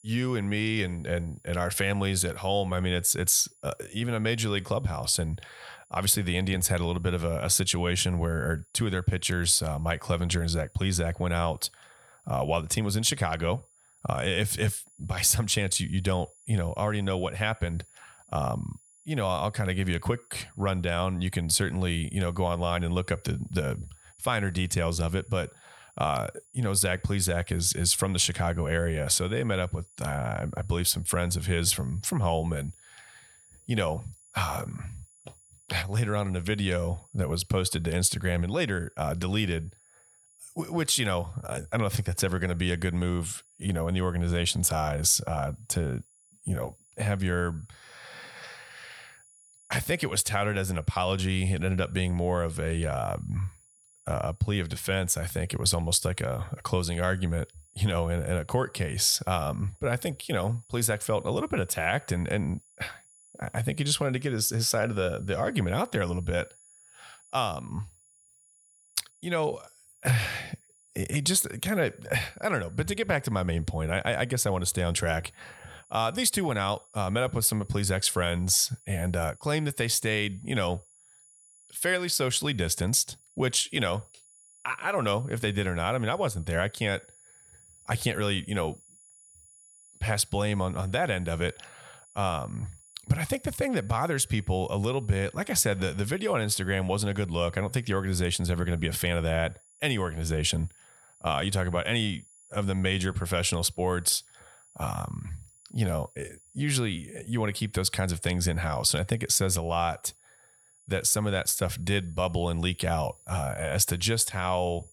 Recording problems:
high-pitched whine; faint; throughout; 10 kHz, 30 dB below the speech

